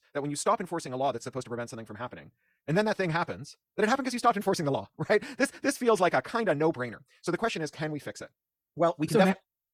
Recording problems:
wrong speed, natural pitch; too fast; 1.5 times normal speed

